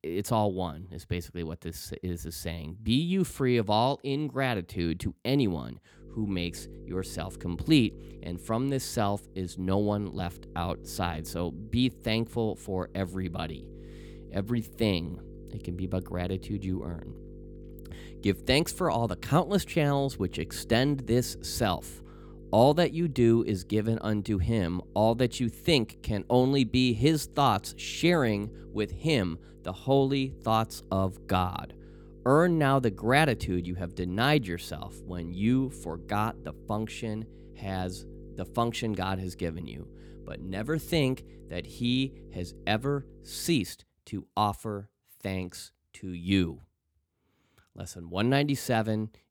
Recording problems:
electrical hum; faint; from 6 to 44 s; 50 Hz, 25 dB below the speech

